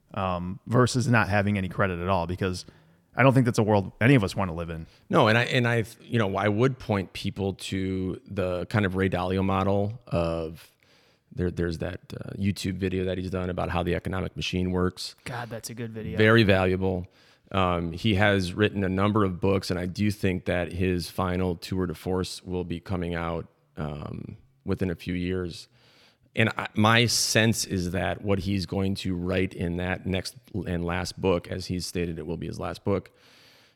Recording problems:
none

